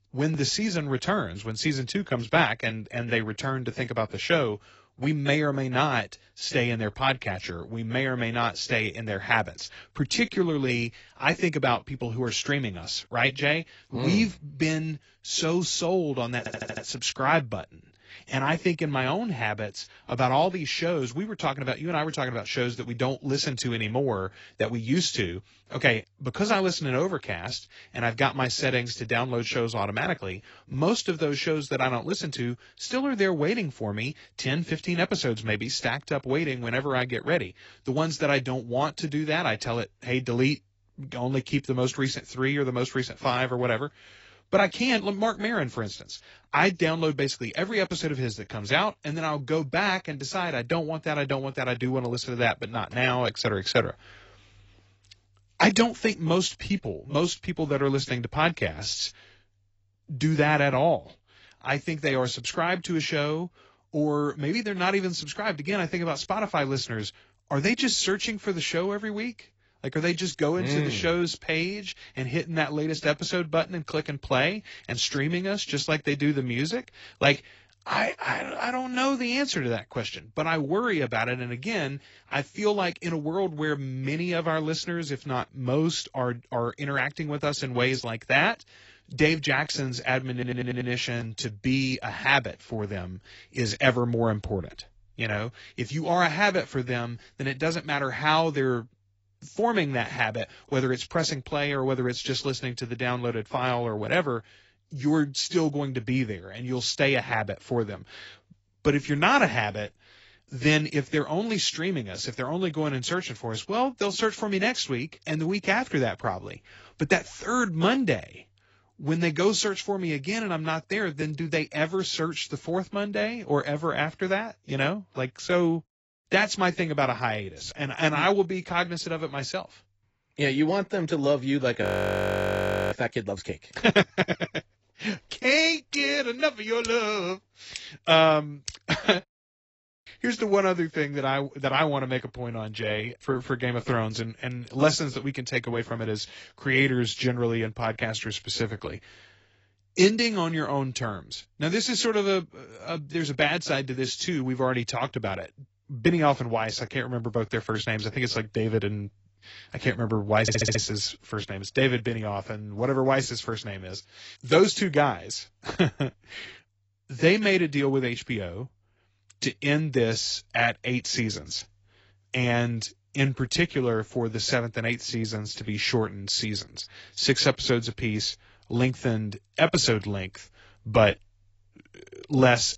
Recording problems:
garbled, watery; badly; nothing above 7.5 kHz
audio stuttering; at 16 s, at 1:30 and at 2:40
audio freezing; at 2:12 for 1 s

